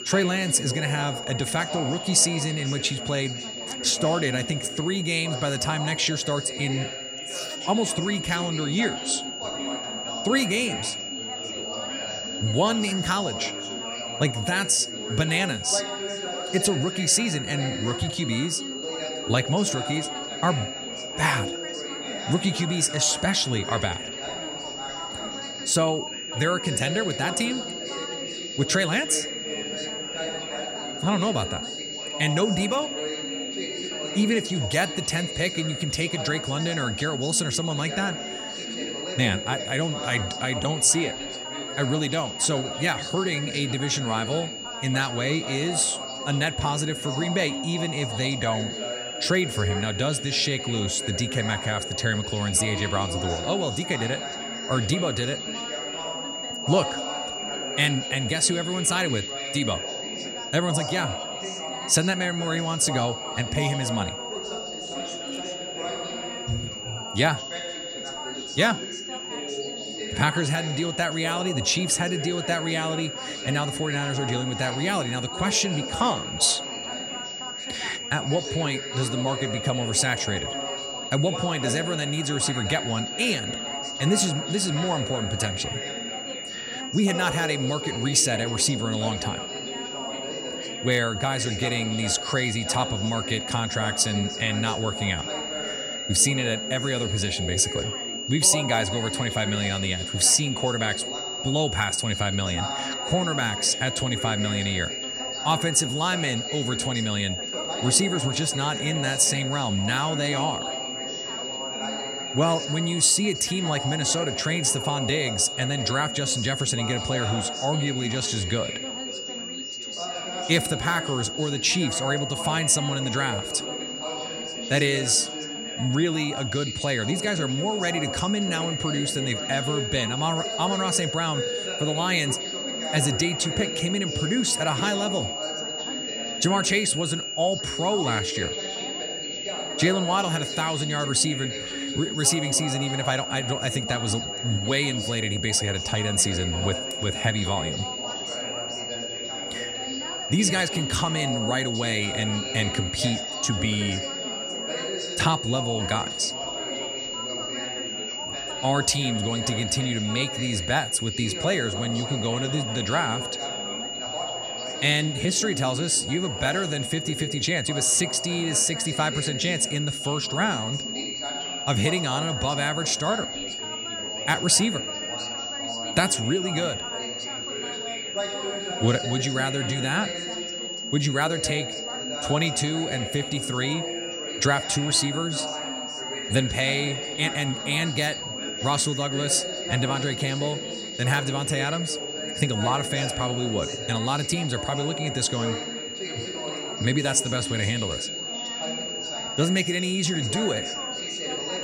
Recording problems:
high-pitched whine; loud; throughout; 3 kHz, 6 dB below the speech
background chatter; noticeable; throughout; 4 voices, 10 dB below the speech

